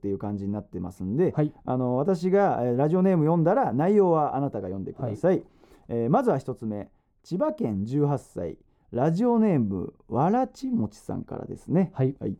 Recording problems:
muffled; slightly; fading above 1 kHz

